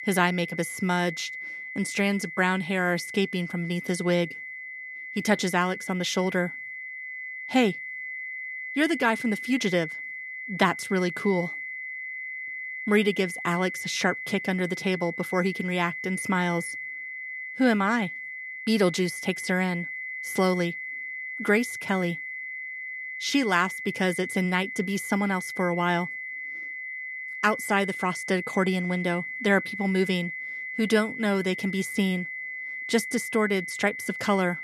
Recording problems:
high-pitched whine; loud; throughout; 2 kHz, 7 dB below the speech

